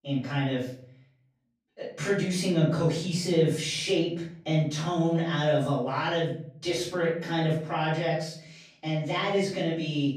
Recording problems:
off-mic speech; far
room echo; noticeable; dies away in 0.5 s

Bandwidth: 15 kHz